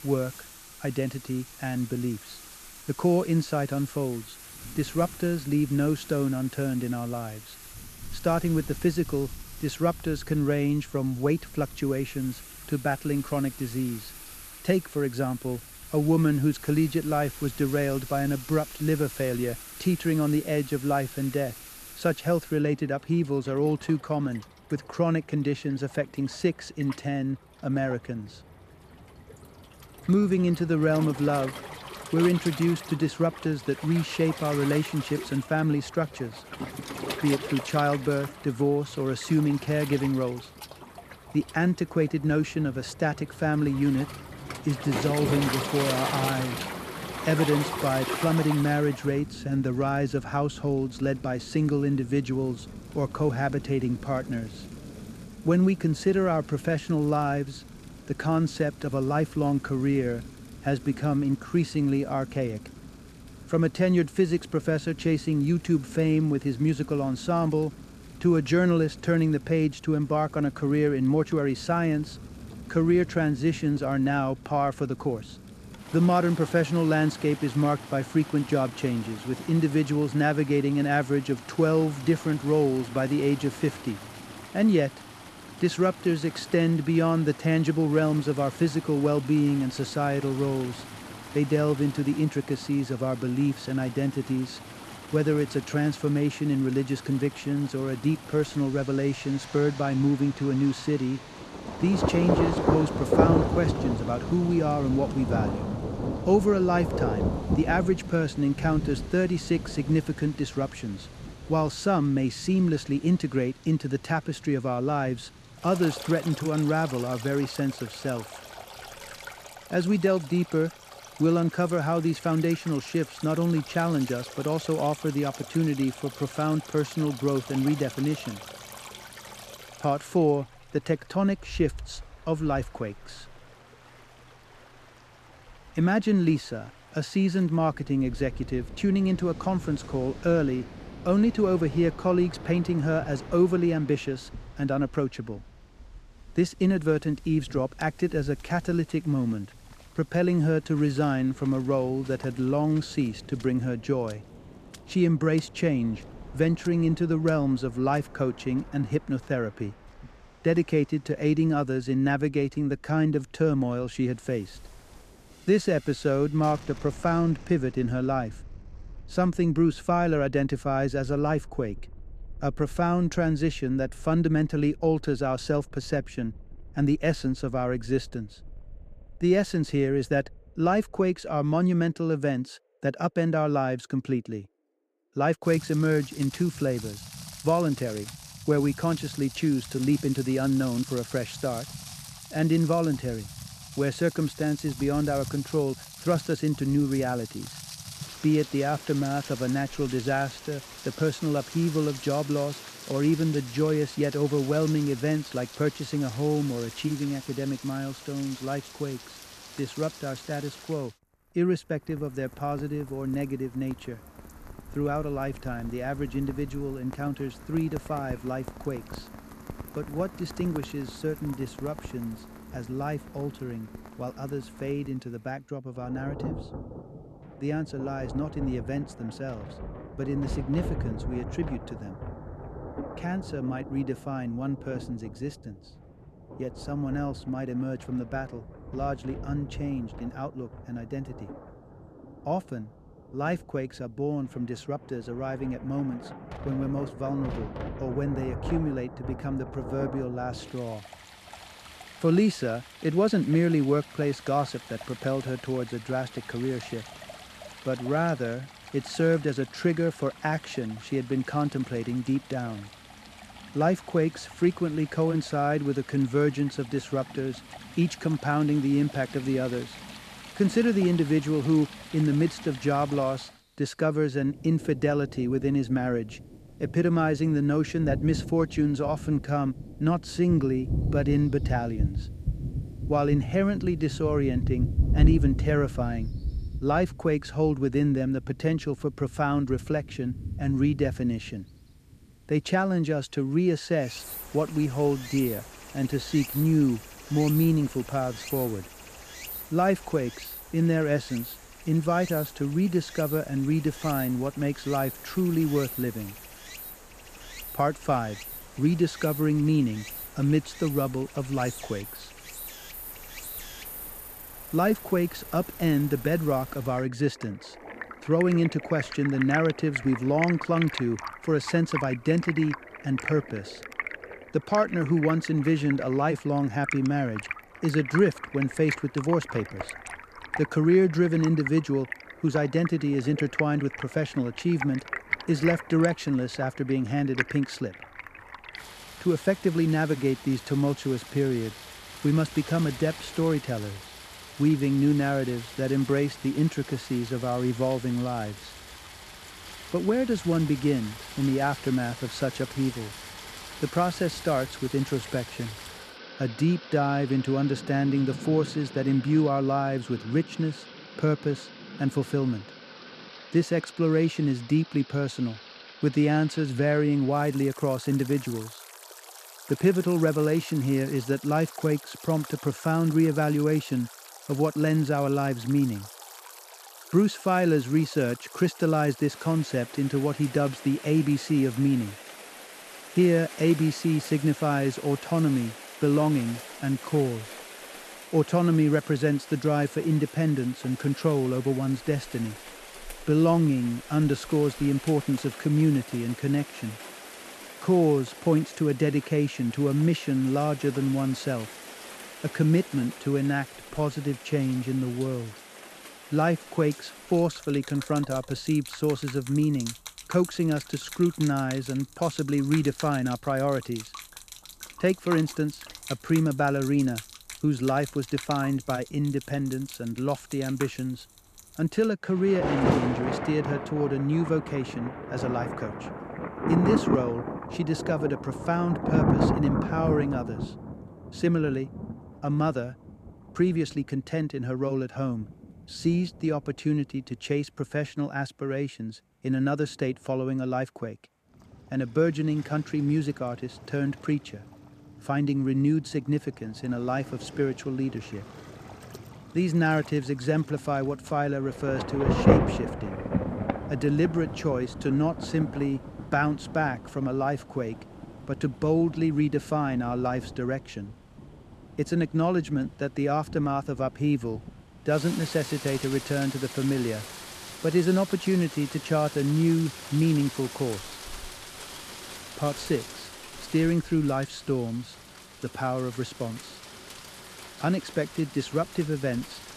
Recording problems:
rain or running water; noticeable; throughout; 10 dB below the speech

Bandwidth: 14.5 kHz